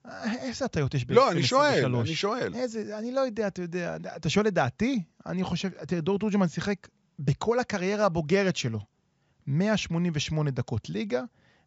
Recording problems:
high frequencies cut off; noticeable; nothing above 8 kHz

